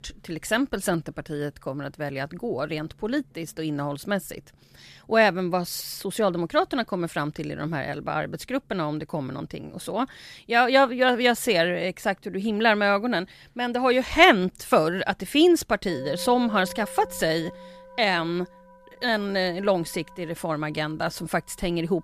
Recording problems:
background music; faint; throughout; 20 dB below the speech

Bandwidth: 14.5 kHz